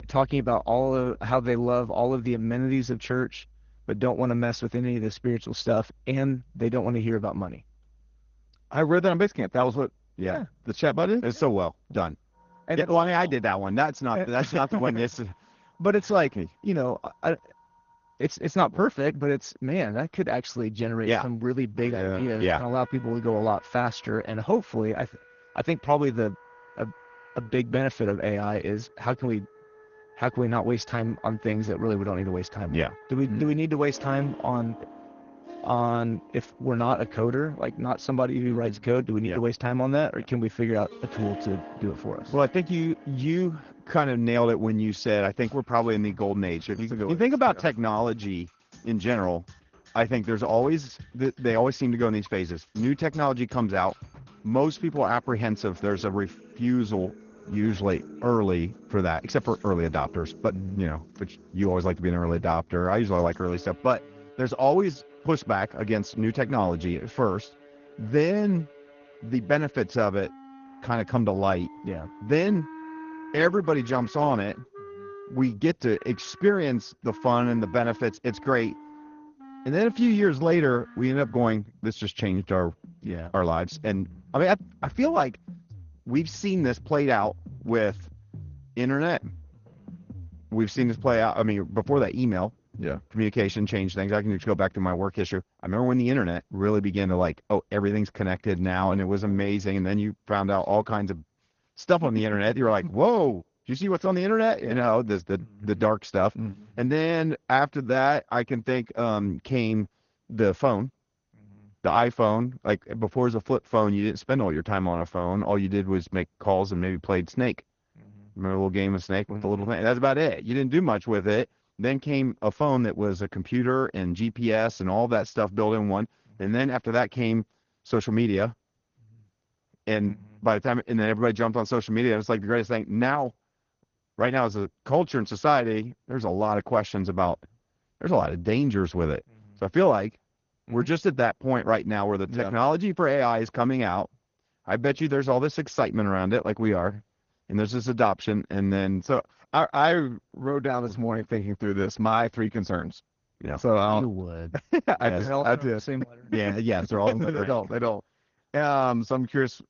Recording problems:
garbled, watery; slightly; nothing above 6.5 kHz
background music; faint; until 1:34; 20 dB below the speech

